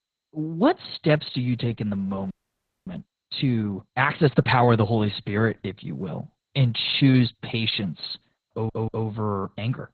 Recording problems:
garbled, watery; badly; nothing above 4 kHz
audio freezing; at 2.5 s for 0.5 s
audio stuttering; at 8.5 s

